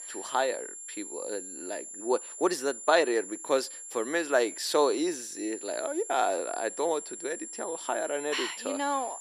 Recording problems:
thin; somewhat; fading below 350 Hz
high-pitched whine; loud; throughout; 7.5 kHz, 9 dB below the speech

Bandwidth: 14.5 kHz